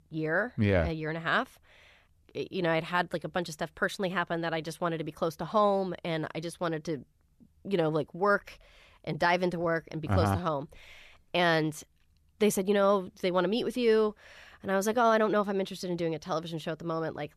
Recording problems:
none

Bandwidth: 14 kHz